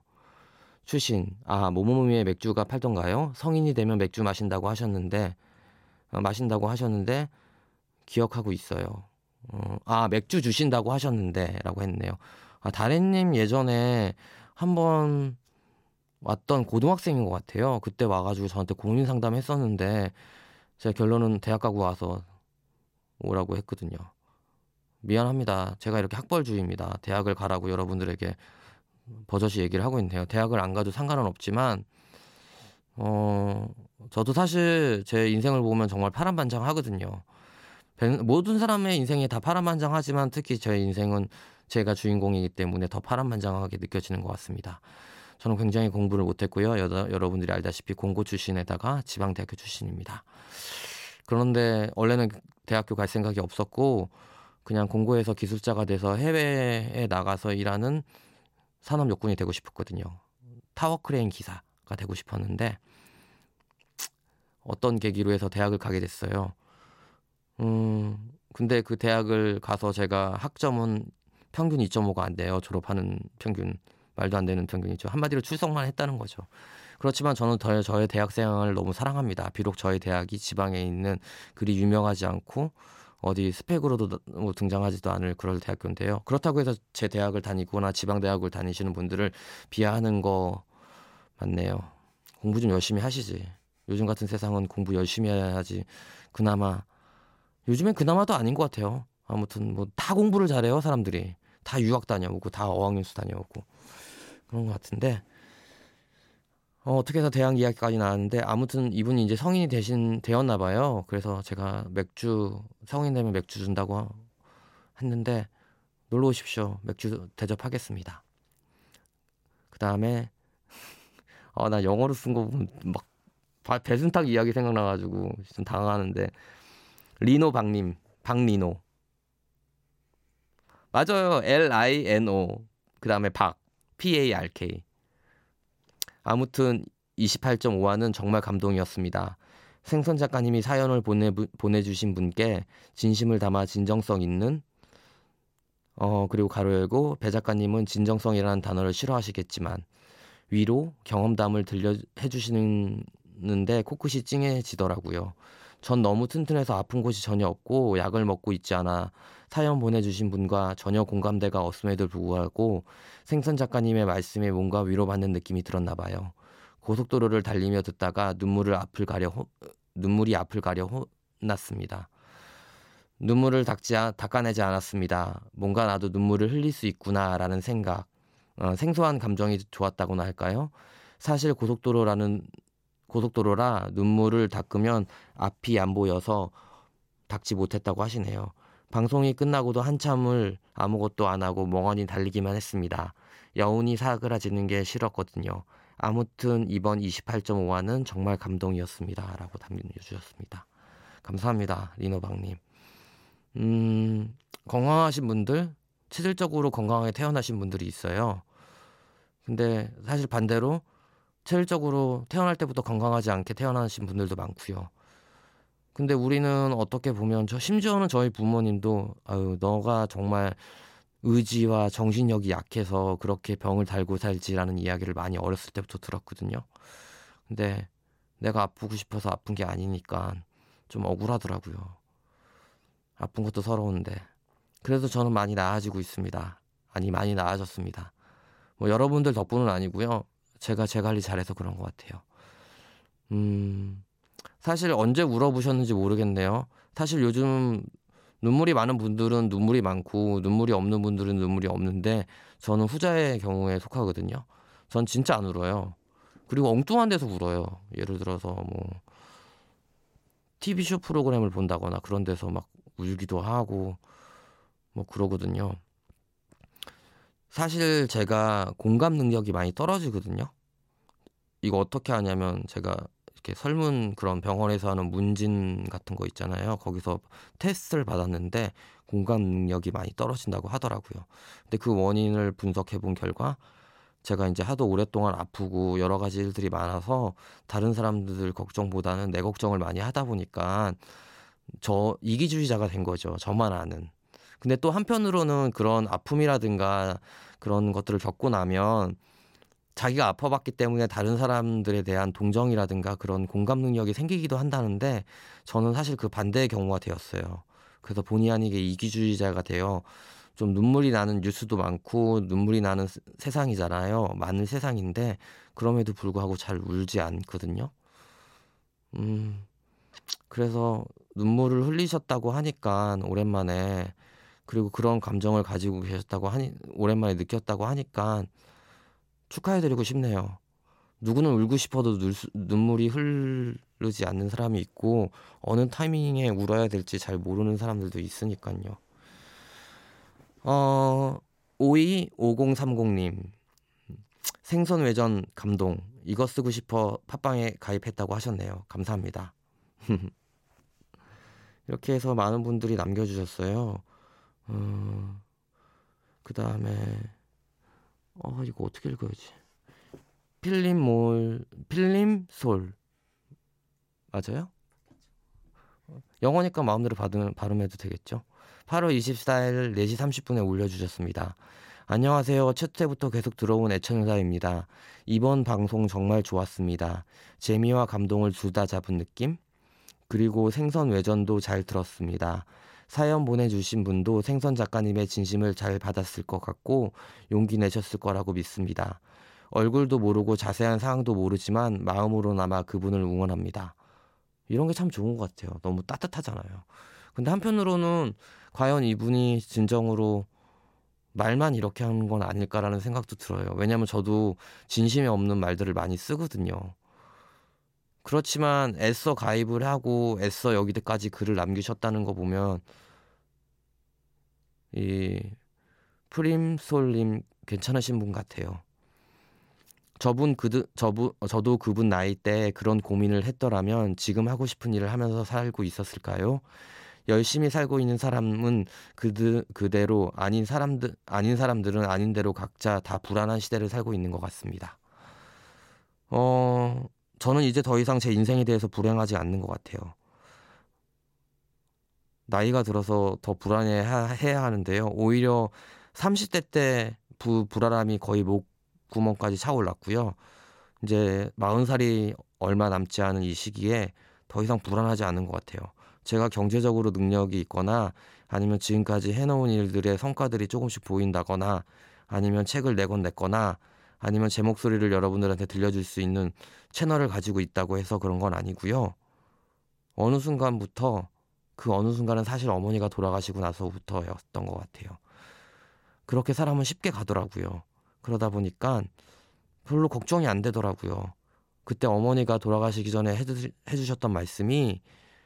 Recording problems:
none

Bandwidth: 16 kHz